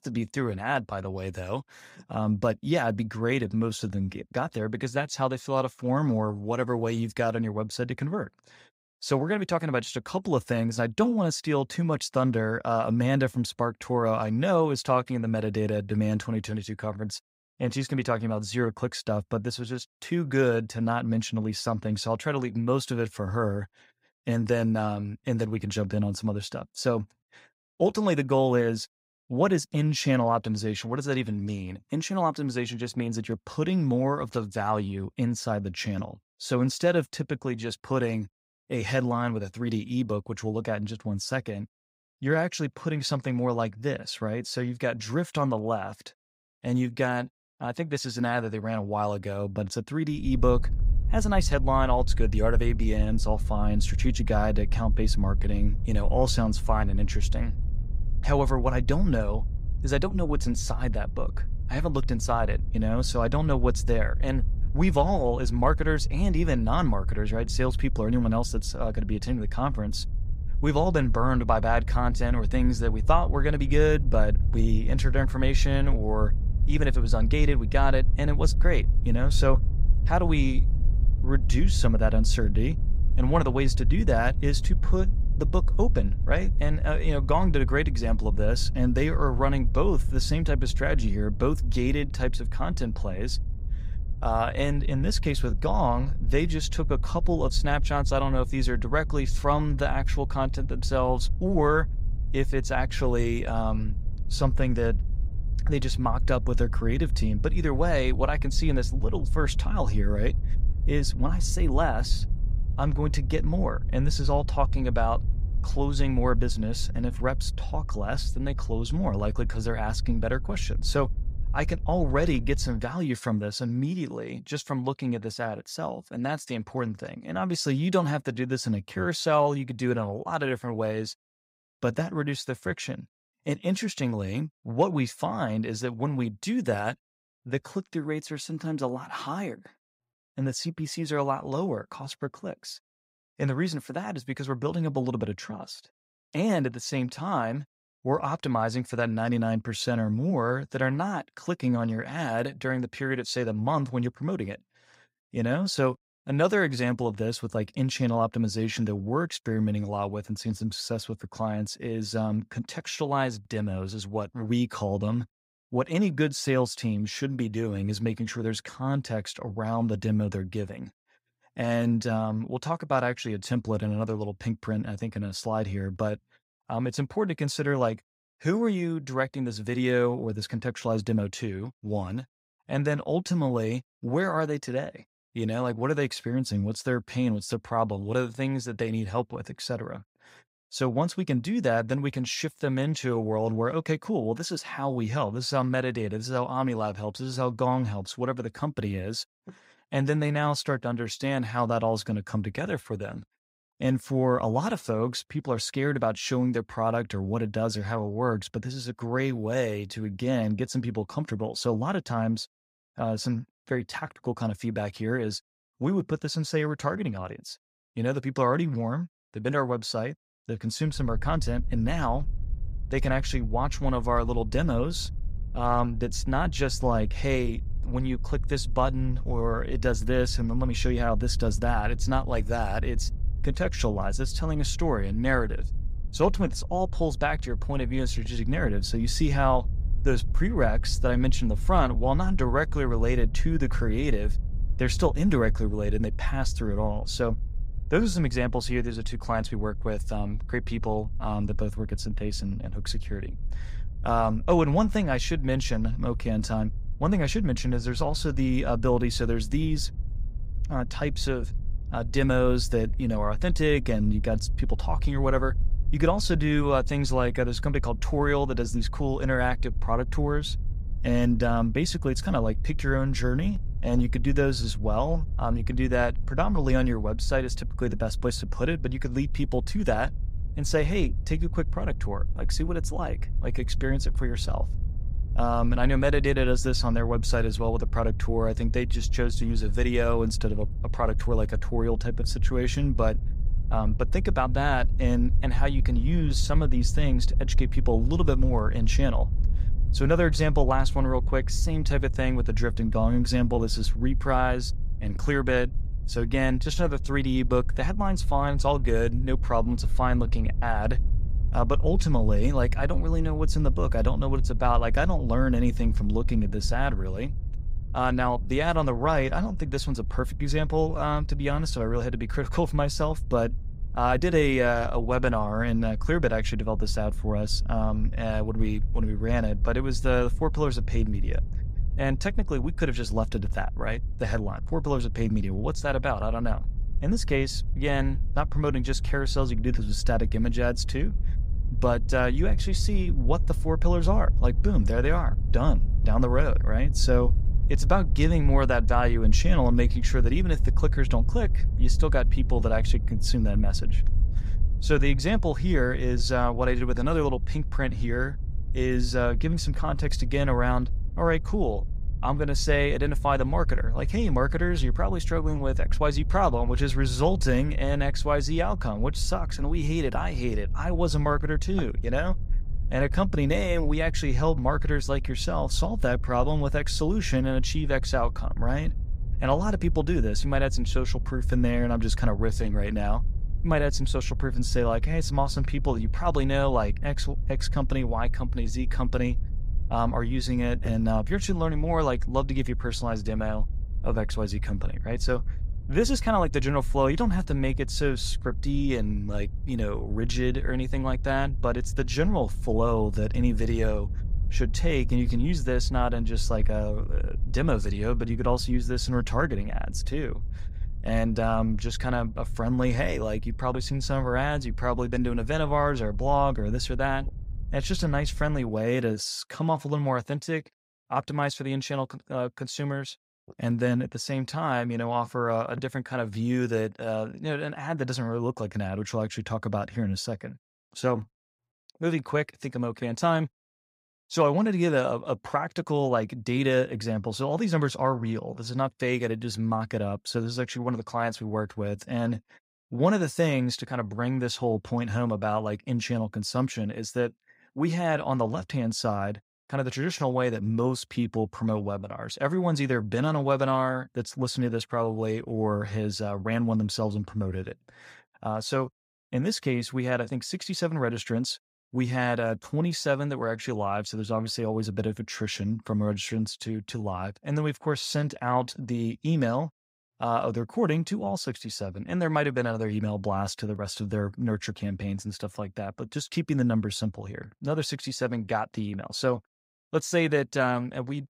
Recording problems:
low rumble; faint; from 50 s to 2:03 and from 3:41 to 6:59; 20 dB below the speech

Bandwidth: 15.5 kHz